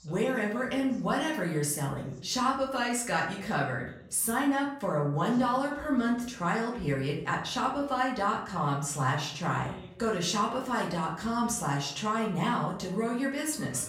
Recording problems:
off-mic speech; far
room echo; slight; dies away in 0.5 s
voice in the background; faint; throughout; 25 dB below the speech

